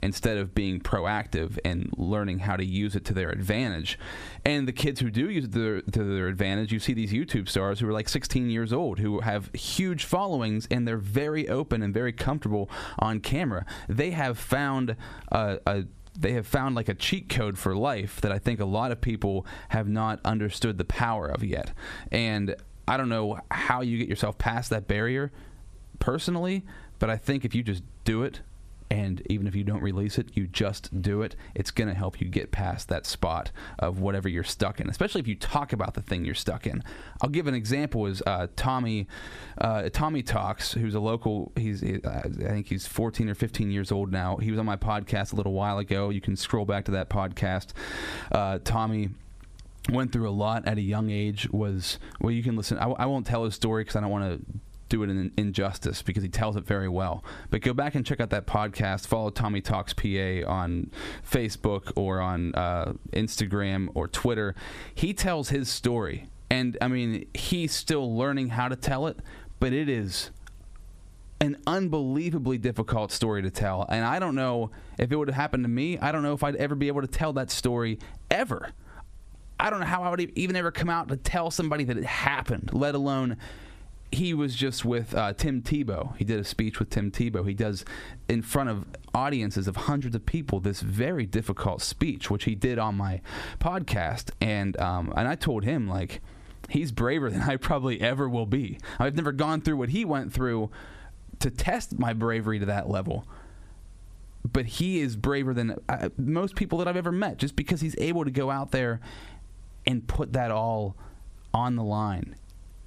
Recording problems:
squashed, flat; heavily

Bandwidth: 14.5 kHz